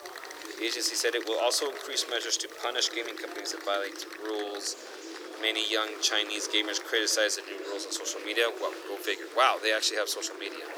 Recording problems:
thin; very; fading below 300 Hz
murmuring crowd; noticeable; throughout; 10 dB below the speech
hiss; faint; throughout; 30 dB below the speech

